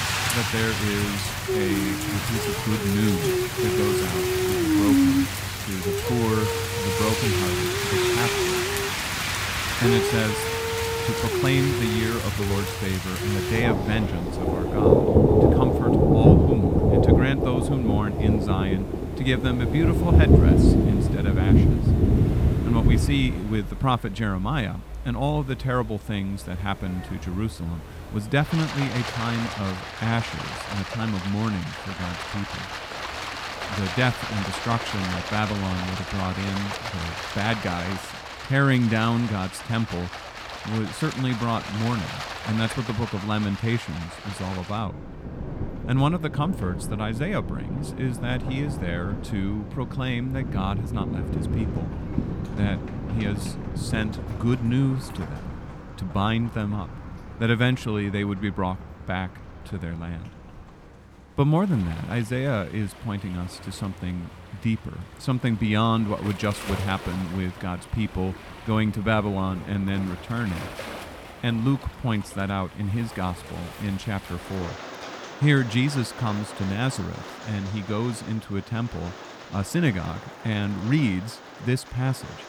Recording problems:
rain or running water; very loud; throughout; 2 dB above the speech
murmuring crowd; faint; throughout; 30 dB below the speech

